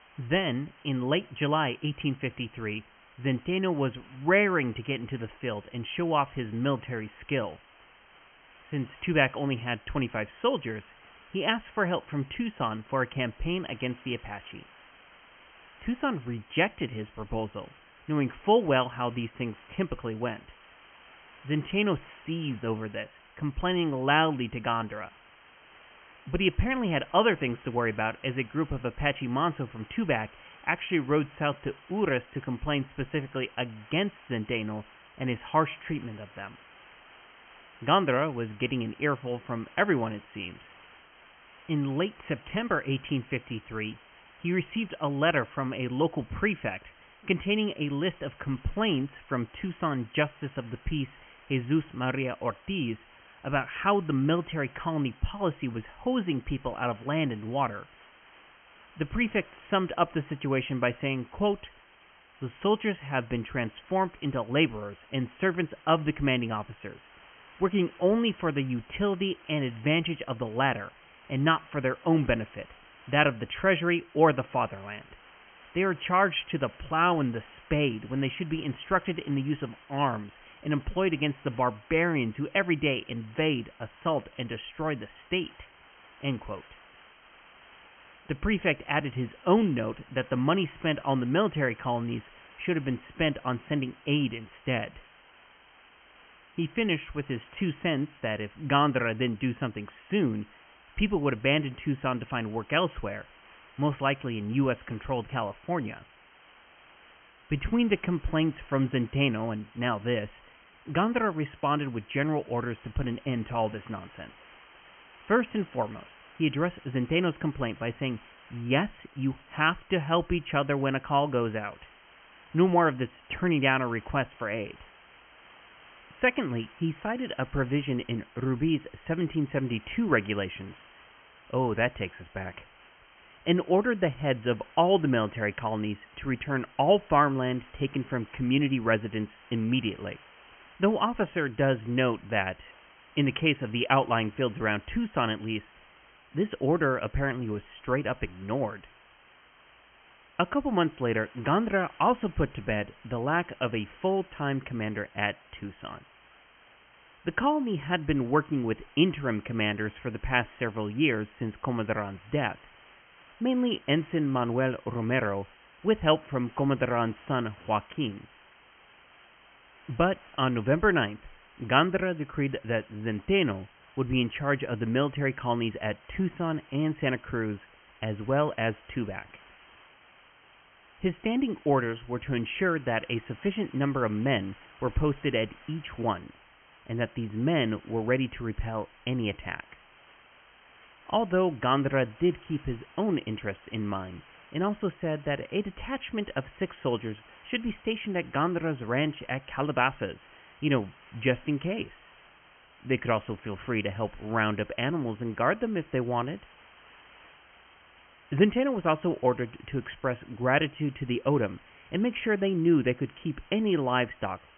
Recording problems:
high frequencies cut off; severe; nothing above 3 kHz
hiss; faint; throughout; 25 dB below the speech

